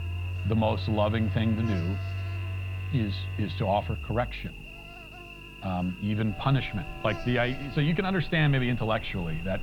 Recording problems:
muffled; slightly; fading above 3.5 kHz
alarms or sirens; loud; throughout; 8 dB below the speech
electrical hum; noticeable; throughout; 50 Hz, 10 dB below the speech

